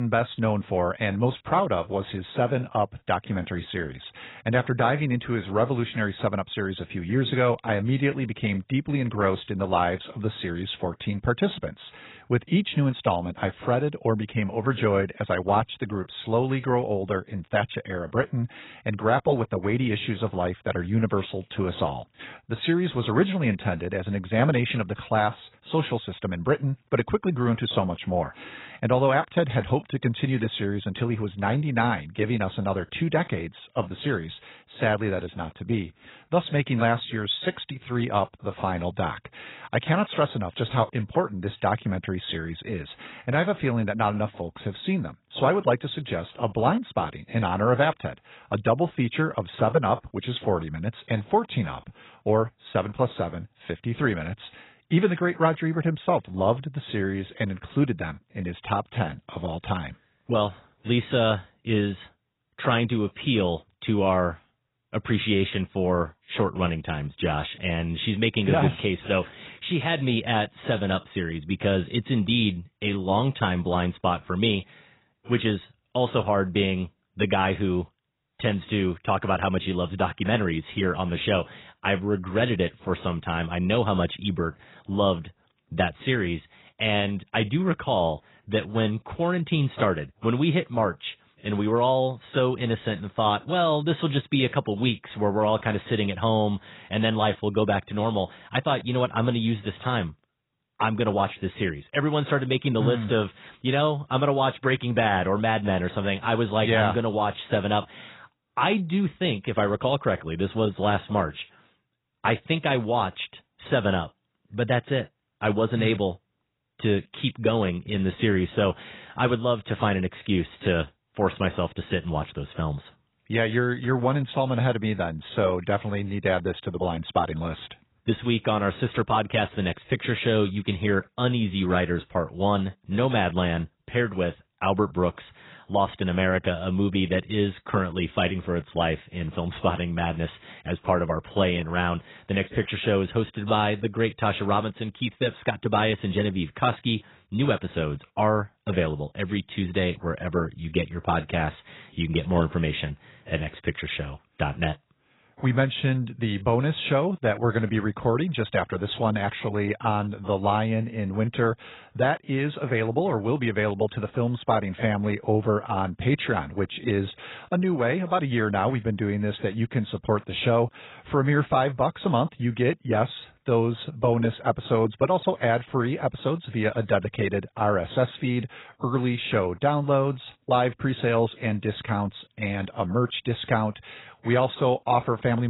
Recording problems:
garbled, watery; badly; nothing above 4 kHz
abrupt cut into speech; at the start and the end

